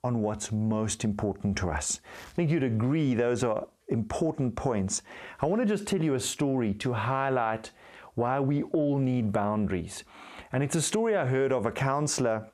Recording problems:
squashed, flat; heavily

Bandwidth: 14.5 kHz